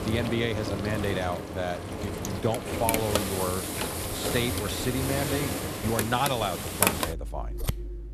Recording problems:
household noises; very loud; throughout; as loud as the speech

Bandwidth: 14.5 kHz